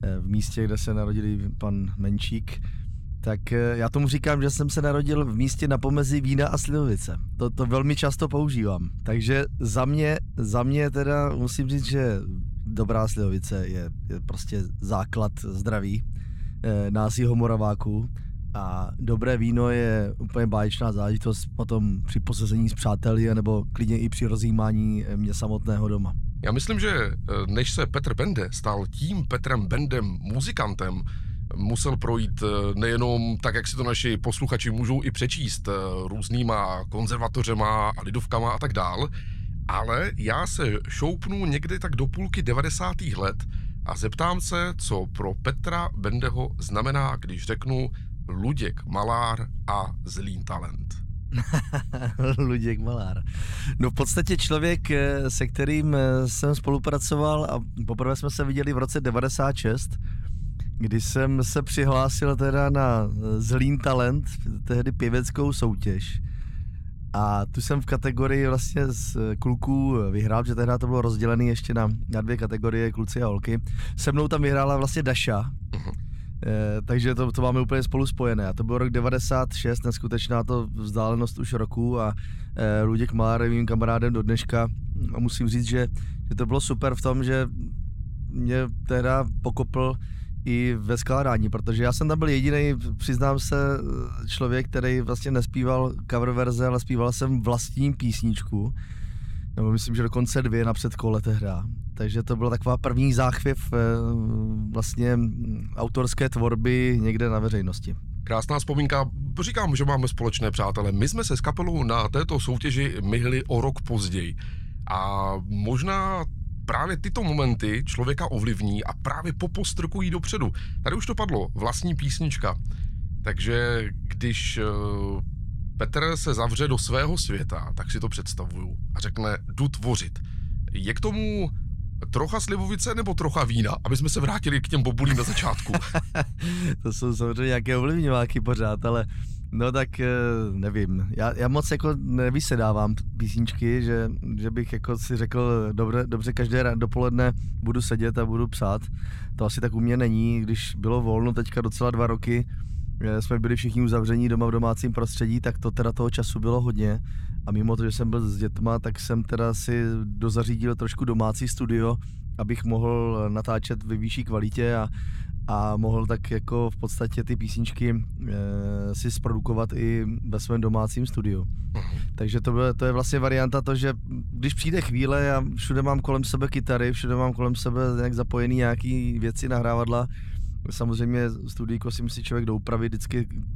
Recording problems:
low rumble; faint; throughout; 20 dB below the speech

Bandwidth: 16.5 kHz